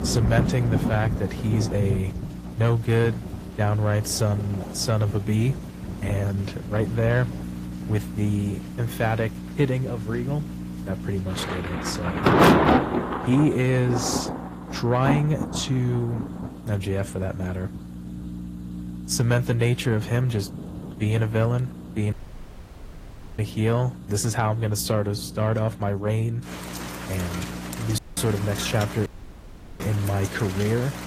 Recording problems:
distortion; slight; 10 dB below the speech
garbled, watery; slightly; nothing above 15 kHz
rain or running water; loud; throughout; 4 dB below the speech
electrical hum; noticeable; throughout; 60 Hz, 15 dB below the speech
audio cutting out; at 22 s for 1.5 s, at 28 s and at 29 s for 0.5 s

